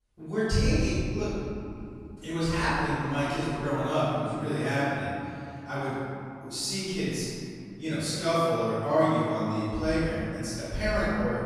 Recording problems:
room echo; strong; dies away in 2.8 s
off-mic speech; far

